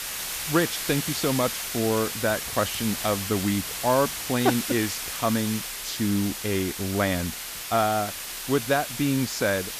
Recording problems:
hiss; loud; throughout; 4 dB below the speech
household noises; faint; until 4.5 s; 25 dB below the speech

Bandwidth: 14.5 kHz